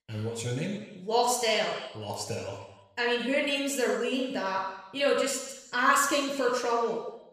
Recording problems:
room echo; noticeable; dies away in 1 s
off-mic speech; somewhat distant

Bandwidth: 14.5 kHz